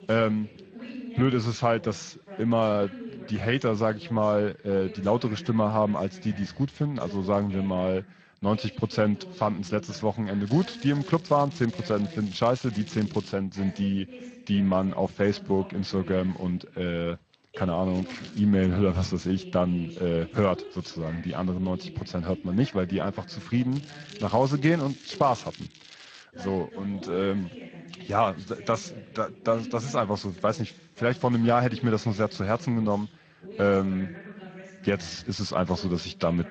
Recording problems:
garbled, watery; slightly; nothing above 7 kHz
voice in the background; noticeable; throughout; 15 dB below the speech
crackling; faint; from 10 to 13 s, at 18 s and from 24 to 26 s; 20 dB below the speech

